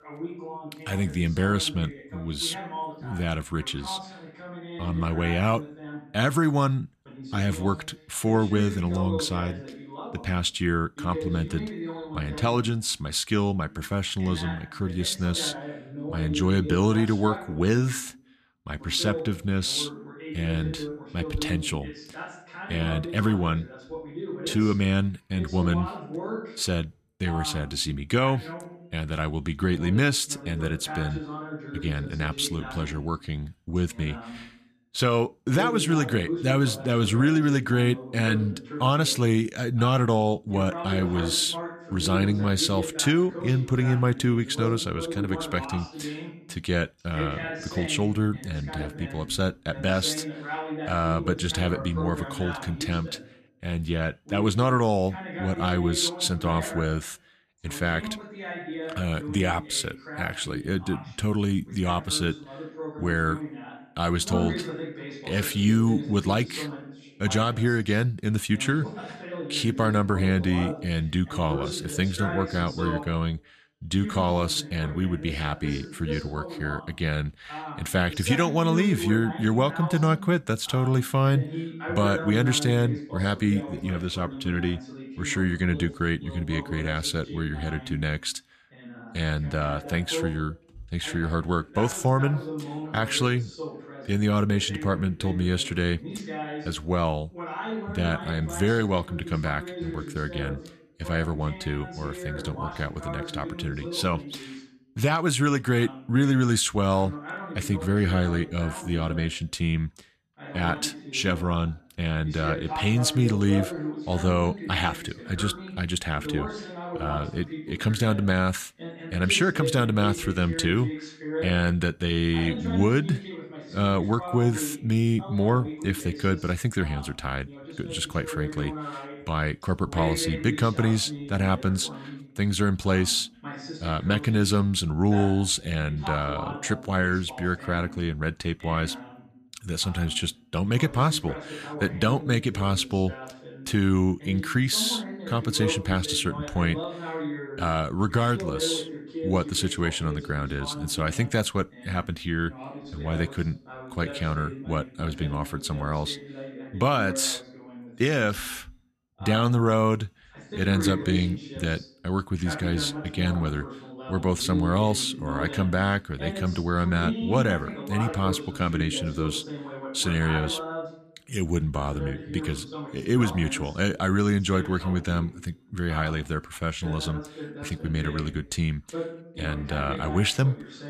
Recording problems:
voice in the background; noticeable; throughout; 10 dB below the speech

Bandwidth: 14.5 kHz